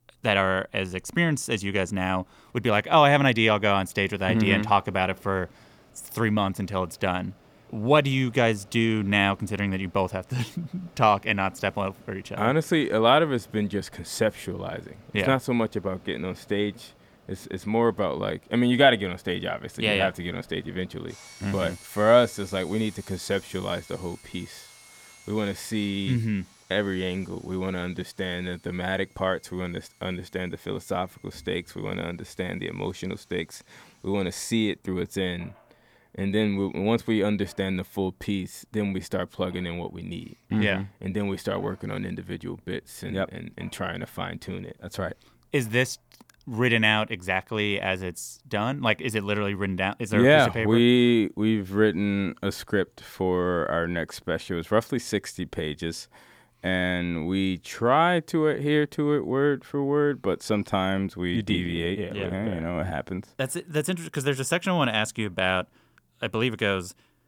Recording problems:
machinery noise; faint; throughout; 25 dB below the speech

